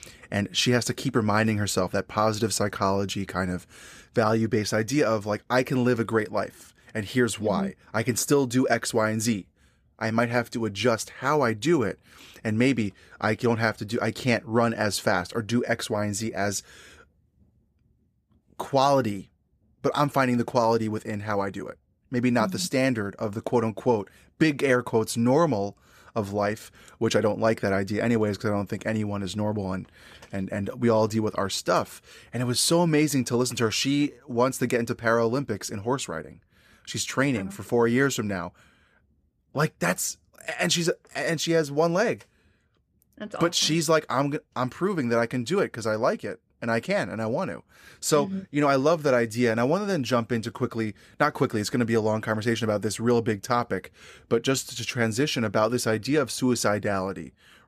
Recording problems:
none

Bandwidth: 14.5 kHz